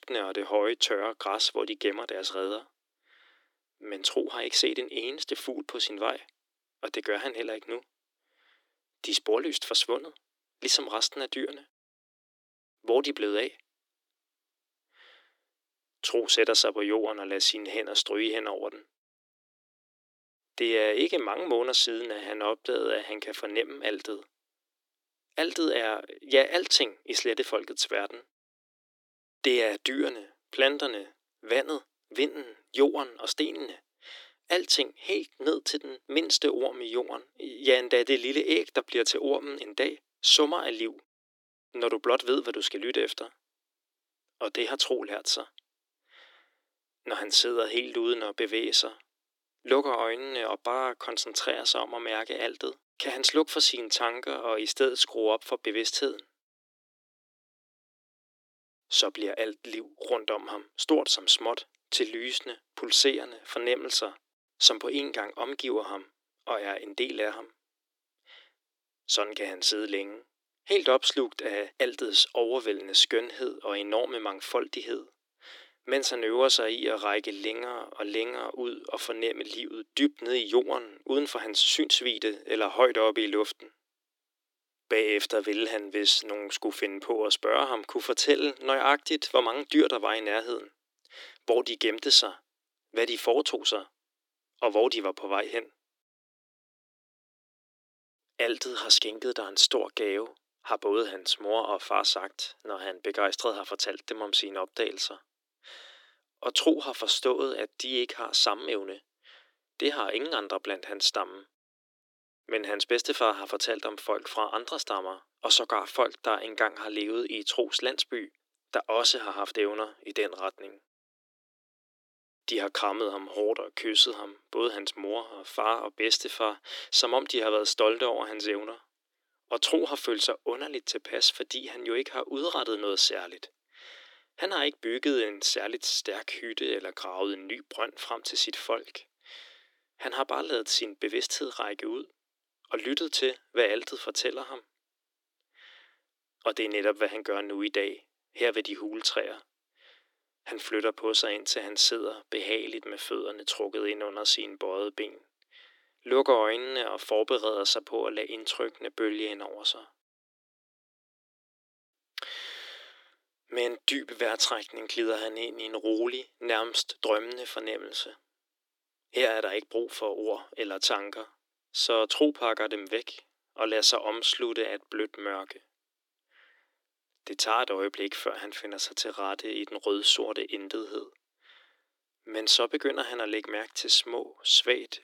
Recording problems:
thin; very; fading below 300 Hz

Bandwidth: 17.5 kHz